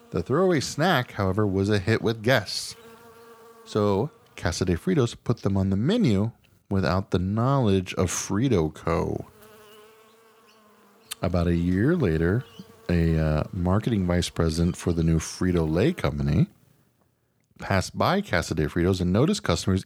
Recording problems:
electrical hum; faint; until 5 s and from 9 to 16 s; 50 Hz, 25 dB below the speech

